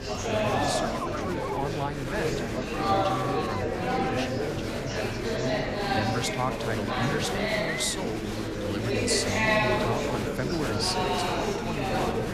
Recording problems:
murmuring crowd; very loud; throughout; 5 dB above the speech

